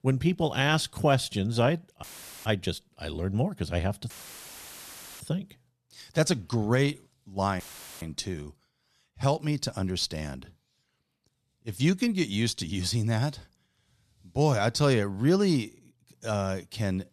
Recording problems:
audio cutting out; filled with static; at 2 s, at 4 s for 1 s and at 7.5 s

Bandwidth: 13.5 kHz